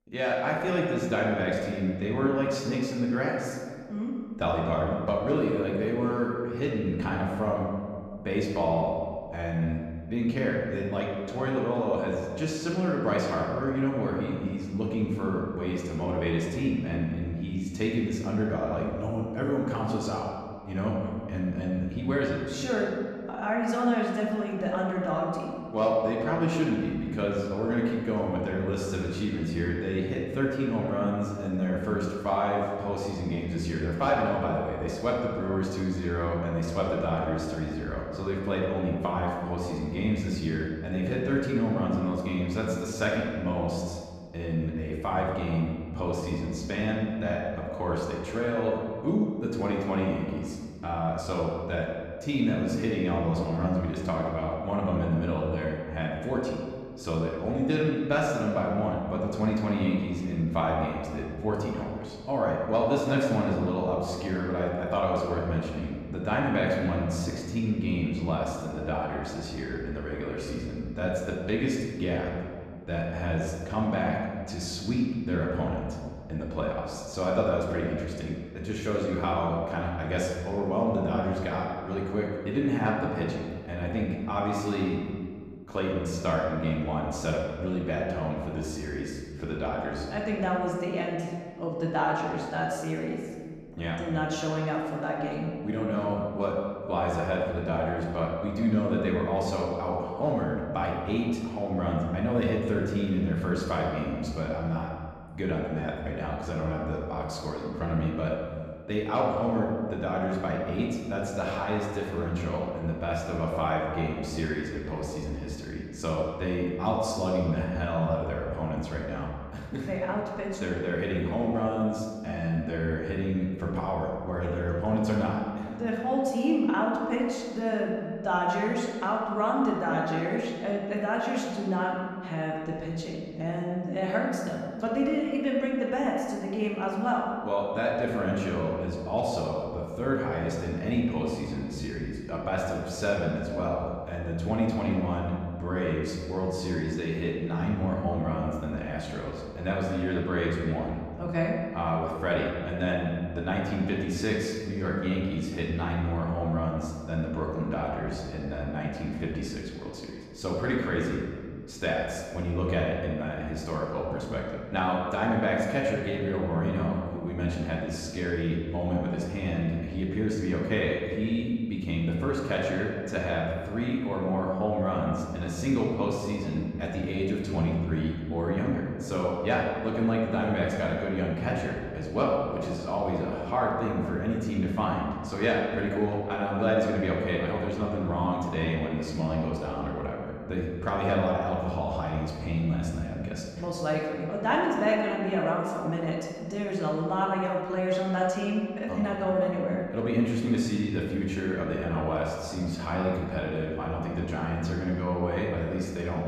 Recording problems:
off-mic speech; far
room echo; noticeable; dies away in 1.6 s

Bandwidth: 14.5 kHz